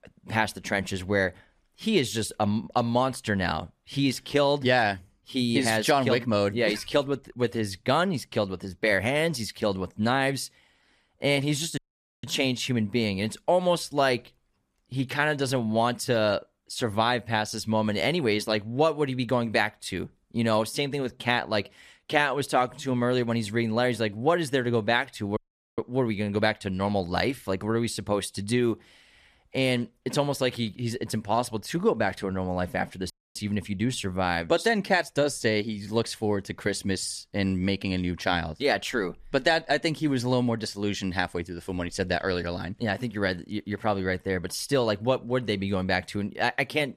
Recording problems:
audio cutting out; at 12 s, at 25 s and at 33 s

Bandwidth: 14.5 kHz